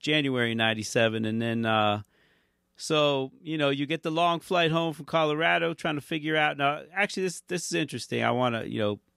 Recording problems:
none

